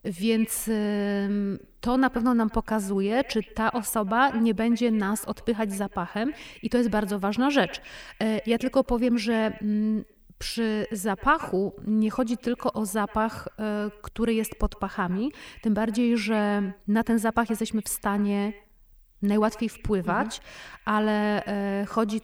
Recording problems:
echo of what is said; faint; throughout; 110 ms later, 20 dB below the speech

